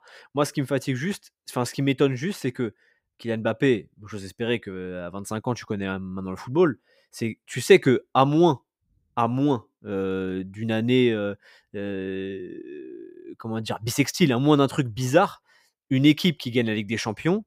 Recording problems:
none

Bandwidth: 15.5 kHz